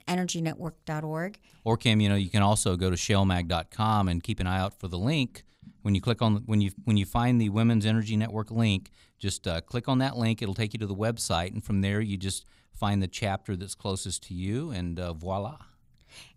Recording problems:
none

